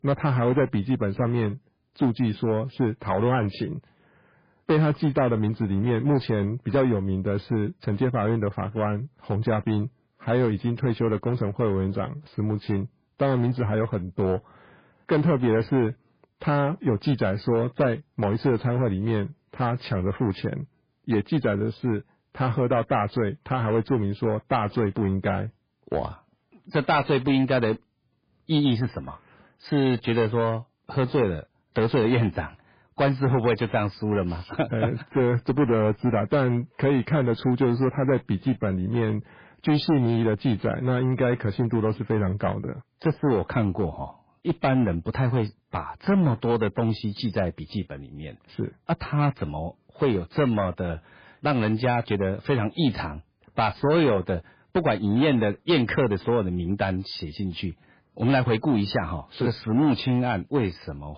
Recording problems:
garbled, watery; badly; nothing above 5 kHz
distortion; slight; 6% of the sound clipped

